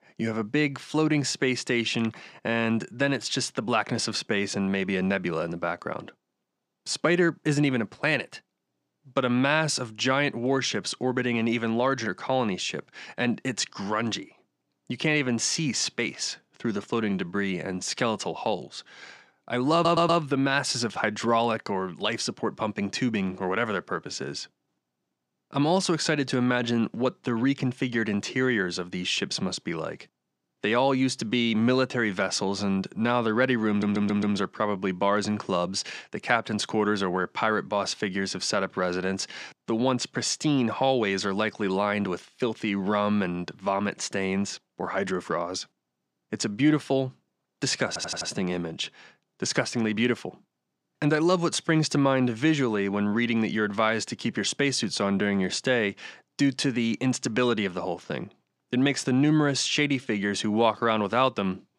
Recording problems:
audio stuttering; at 20 s, at 34 s and at 48 s

